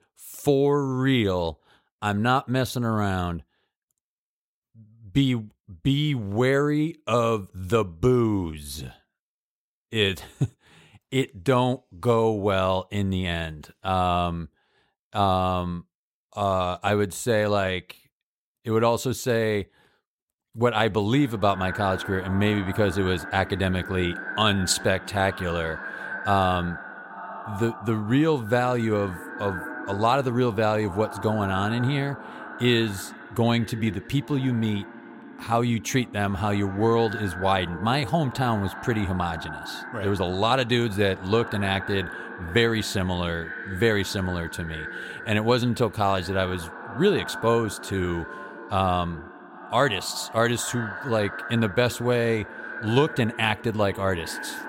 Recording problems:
echo of what is said; strong; from 21 s on; 370 ms later, 10 dB below the speech

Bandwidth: 16 kHz